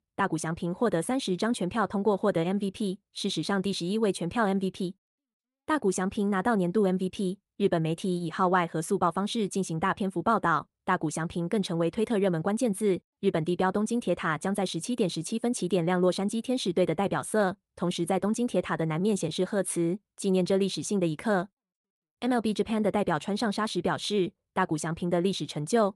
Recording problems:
none

